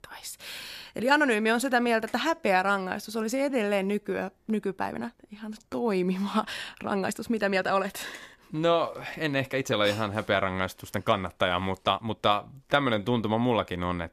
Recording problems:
uneven, jittery; strongly; from 2 to 13 s

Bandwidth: 14 kHz